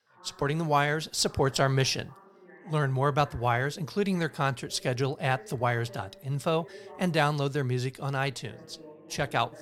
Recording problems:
background chatter; faint; throughout; 2 voices, 25 dB below the speech

